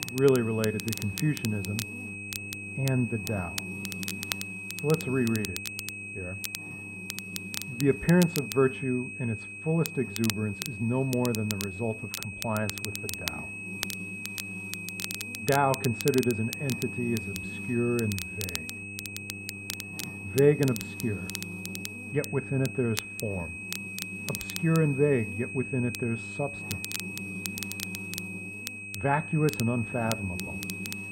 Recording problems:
muffled; very; fading above 1.5 kHz
high-pitched whine; loud; throughout; 2.5 kHz, 9 dB below the speech
crackle, like an old record; loud; 10 dB below the speech
electrical hum; noticeable; throughout; 50 Hz, 20 dB below the speech

